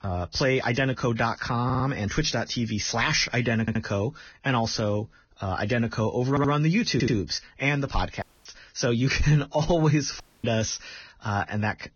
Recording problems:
garbled, watery; badly; nothing above 6.5 kHz
audio stuttering; 4 times, first at 1.5 s
audio cutting out; at 8 s and at 10 s

